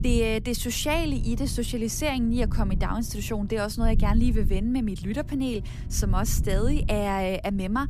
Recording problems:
low rumble; noticeable; throughout; 15 dB below the speech
electrical hum; faint; from 1 to 3.5 s and from 5 to 7 s; 60 Hz, 25 dB below the speech

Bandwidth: 14.5 kHz